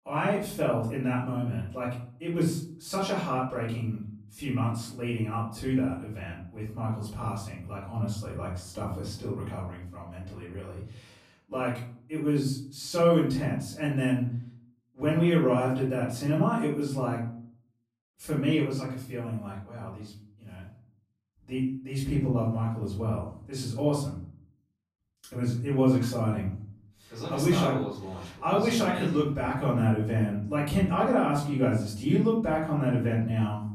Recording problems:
off-mic speech; far
room echo; noticeable; dies away in 0.5 s

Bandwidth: 14.5 kHz